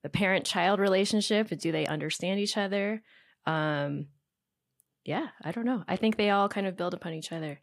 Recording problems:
none

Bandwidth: 15.5 kHz